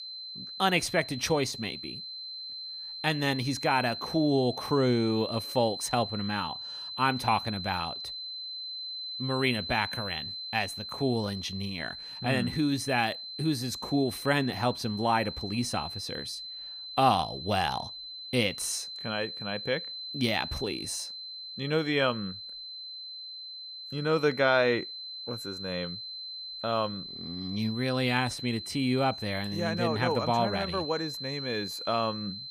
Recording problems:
high-pitched whine; loud; throughout; 4 kHz, 8 dB below the speech

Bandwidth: 15.5 kHz